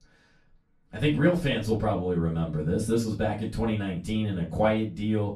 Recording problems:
off-mic speech; far
room echo; very slight; dies away in 0.3 s

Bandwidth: 14.5 kHz